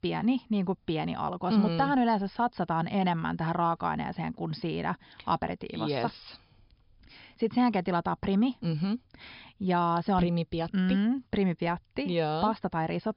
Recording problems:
high frequencies cut off; noticeable; nothing above 5.5 kHz

